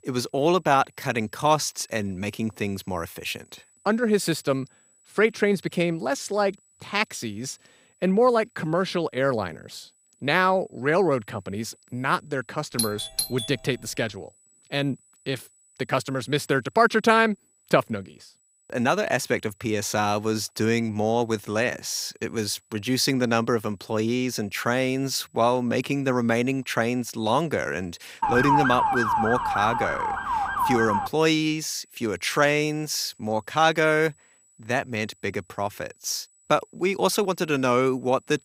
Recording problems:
high-pitched whine; faint; throughout; 8 kHz, 35 dB below the speech
doorbell; noticeable; at 13 s; peak 3 dB below the speech
siren; loud; from 28 to 31 s; peak 4 dB above the speech

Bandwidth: 15.5 kHz